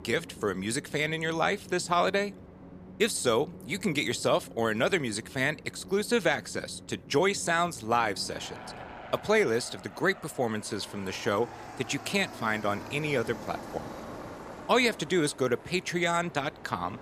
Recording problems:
train or aircraft noise; noticeable; throughout; 15 dB below the speech

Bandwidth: 14.5 kHz